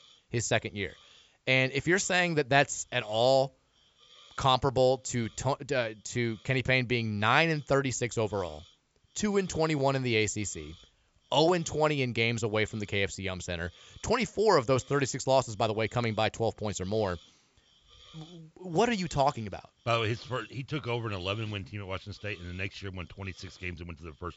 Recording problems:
high frequencies cut off; noticeable; nothing above 8 kHz
hiss; faint; throughout; 30 dB below the speech

